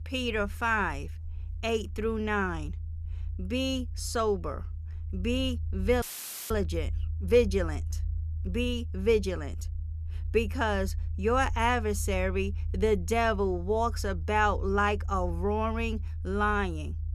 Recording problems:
low rumble; faint; throughout; 25 dB below the speech
audio cutting out; filled with static; at 6 s

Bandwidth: 14 kHz